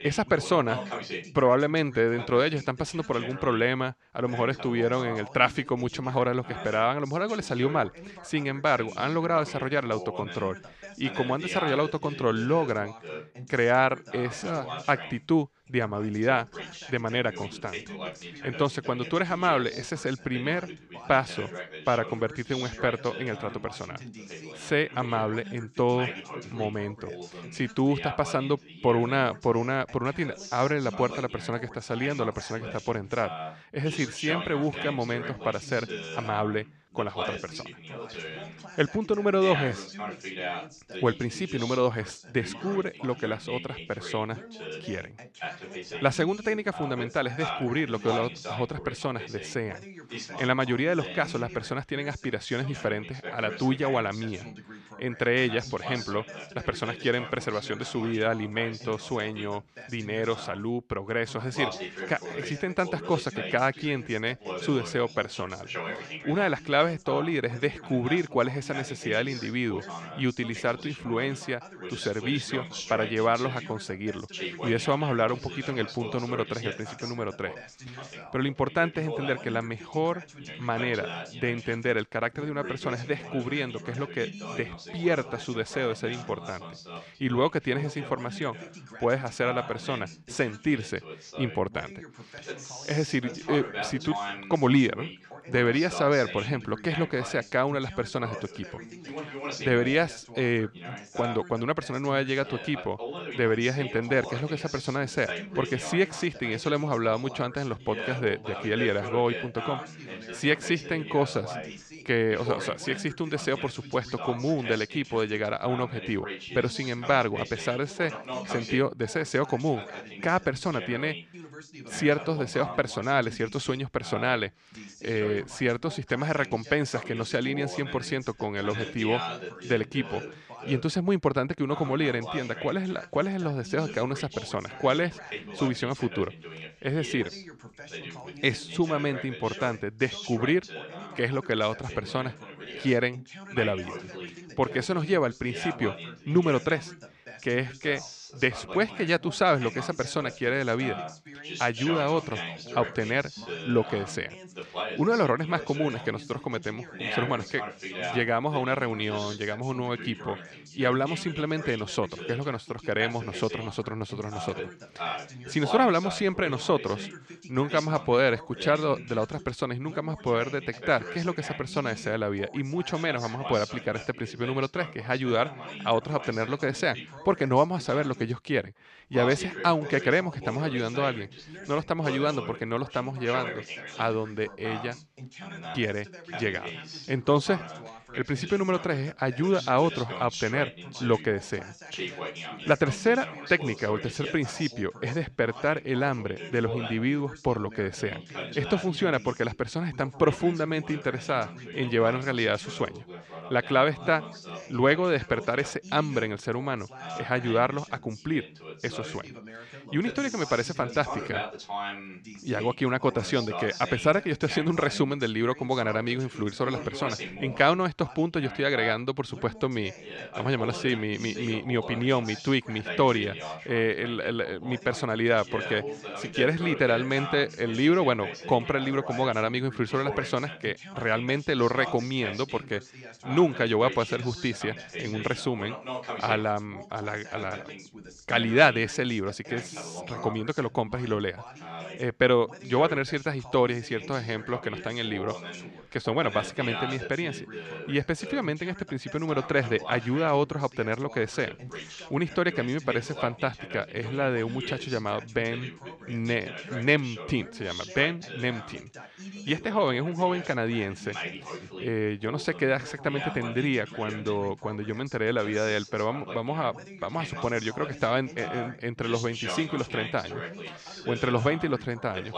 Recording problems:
background chatter; noticeable; throughout; 2 voices, 10 dB below the speech

